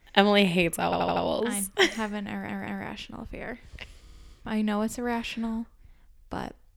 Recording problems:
audio stuttering; at 1 s, at 2.5 s and at 4 s

